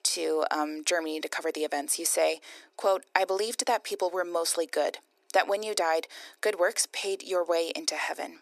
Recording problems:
thin; very; fading below 300 Hz

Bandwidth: 13.5 kHz